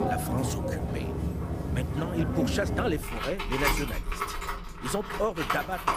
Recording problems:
machinery noise; very loud; throughout; 1 dB above the speech

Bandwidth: 15 kHz